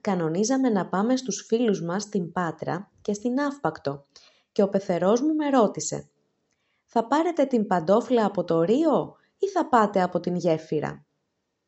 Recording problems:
high frequencies cut off; noticeable; nothing above 8 kHz

